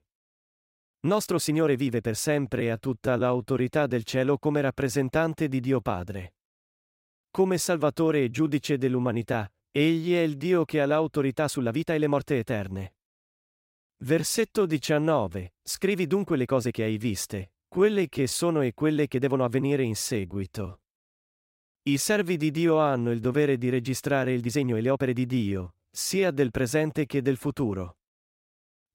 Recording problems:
uneven, jittery; strongly; from 1 to 26 s

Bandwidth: 16 kHz